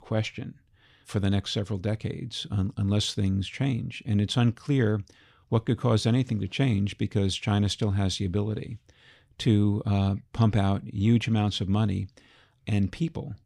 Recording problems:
none

